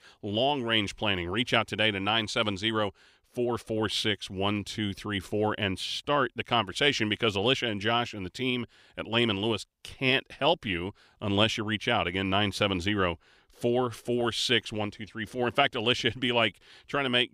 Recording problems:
none

